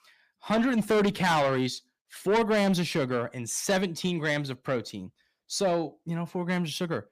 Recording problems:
distortion; heavy; 7 dB below the speech

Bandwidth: 15 kHz